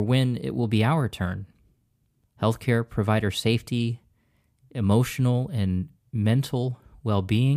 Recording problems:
abrupt cut into speech; at the start and the end

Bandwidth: 15 kHz